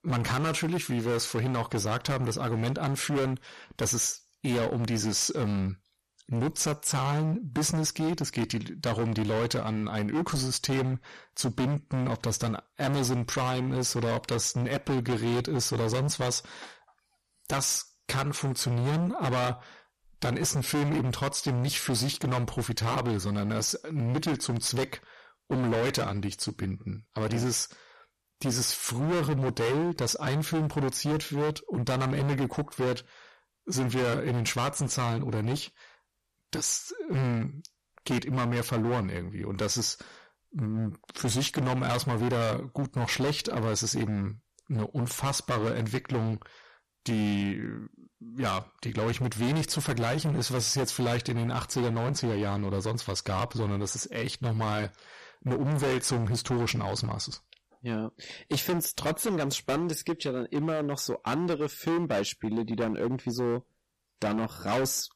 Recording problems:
distortion; heavy; 20% of the sound clipped

